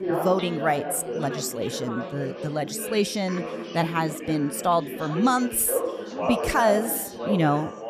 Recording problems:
background chatter; loud; throughout; 4 voices, 6 dB below the speech

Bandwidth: 14.5 kHz